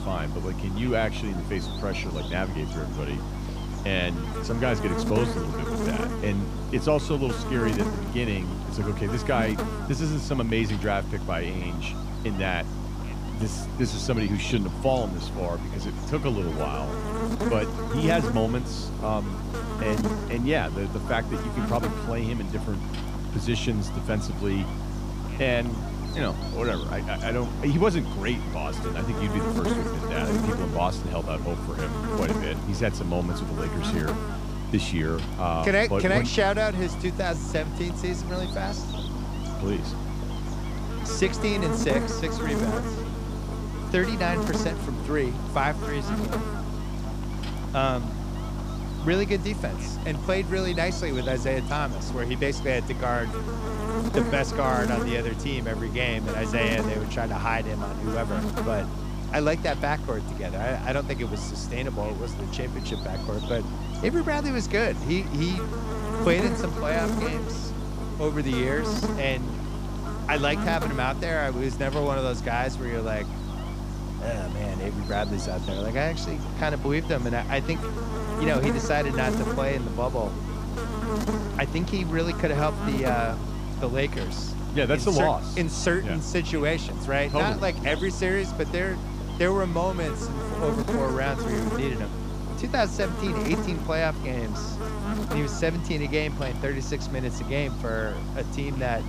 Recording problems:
electrical hum; loud; throughout; 50 Hz, 6 dB below the speech

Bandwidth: 15 kHz